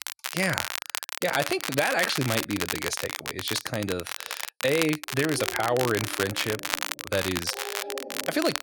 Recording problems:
crackle, like an old record; loud; 3 dB below the speech
dog barking; noticeable; from 5 s on; peak 9 dB below the speech

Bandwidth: 18 kHz